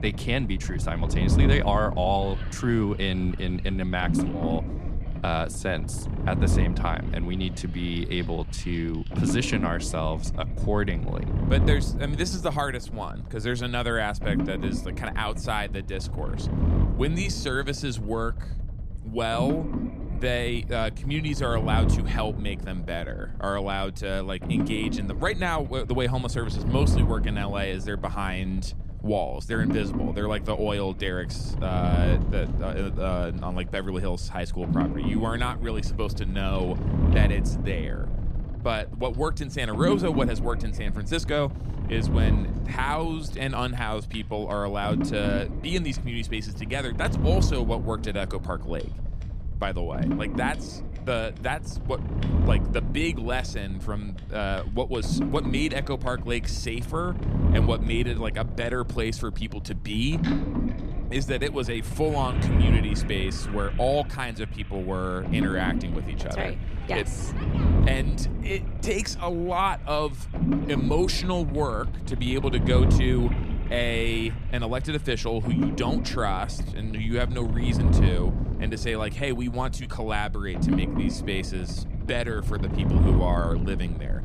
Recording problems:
low rumble; loud; throughout; 7 dB below the speech
household noises; faint; throughout; 20 dB below the speech

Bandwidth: 14.5 kHz